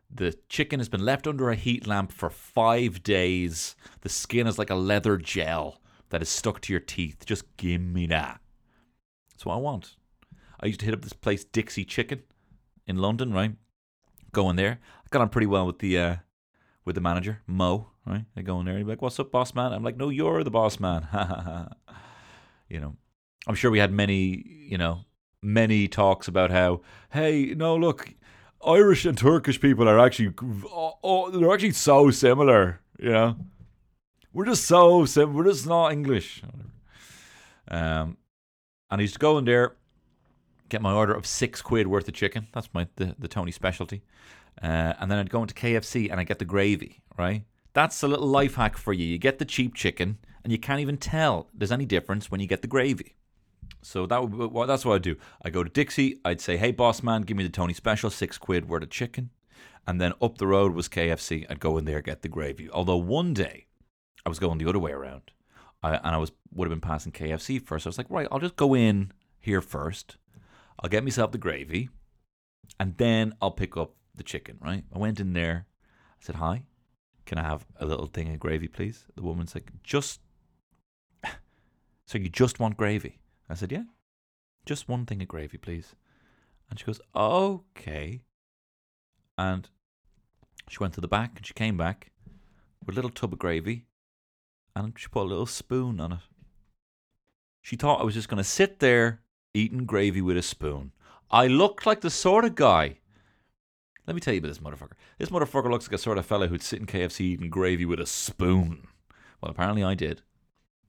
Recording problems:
none

